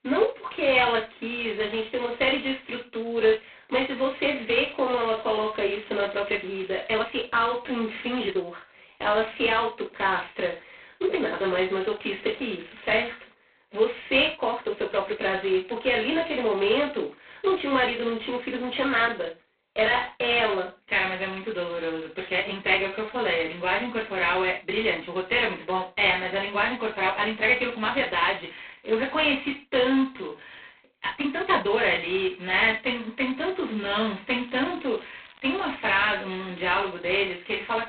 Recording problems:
phone-call audio; poor line; nothing above 3.5 kHz
off-mic speech; far
room echo; noticeable; dies away in 0.3 s
thin; very slightly; fading below 250 Hz
crackling; faint; 4 times, first at 4.5 s; 30 dB below the speech
uneven, jittery; strongly; from 4 to 32 s

